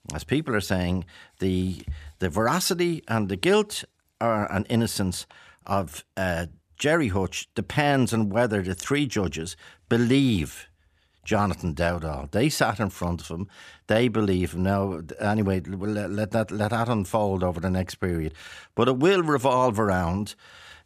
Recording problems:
none

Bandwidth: 14.5 kHz